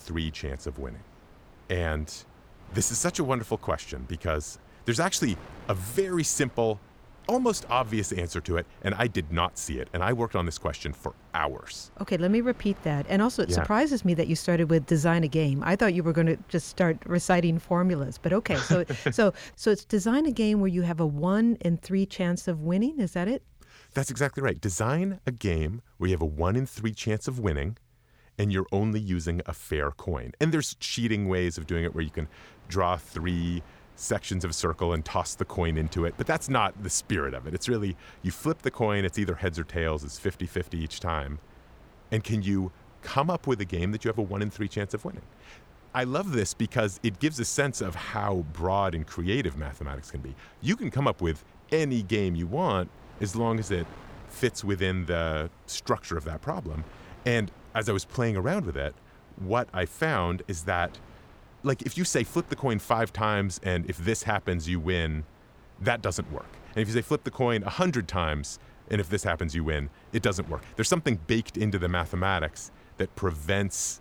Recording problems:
wind noise on the microphone; occasional gusts; until 20 s and from 32 s on; 25 dB below the speech

